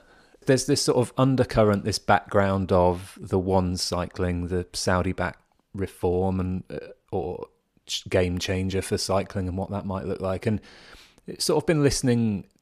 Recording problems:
none

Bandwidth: 15 kHz